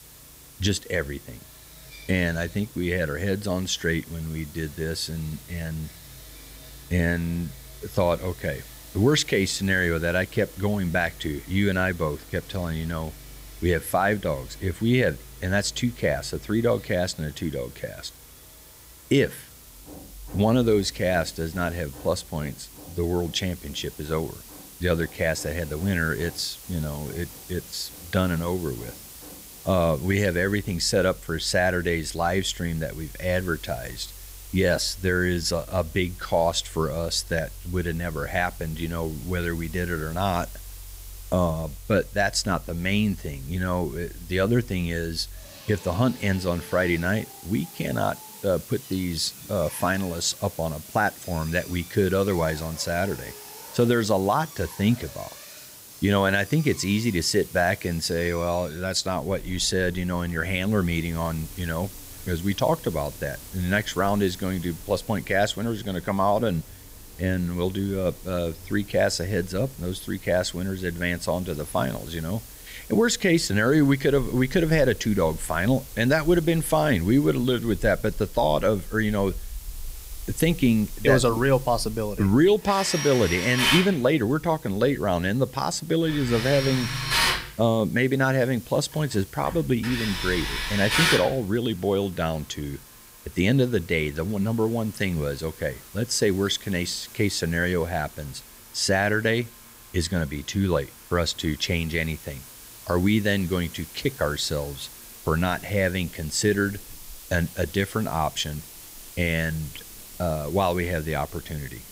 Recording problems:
machinery noise; noticeable; throughout; 10 dB below the speech
hiss; noticeable; throughout; 20 dB below the speech

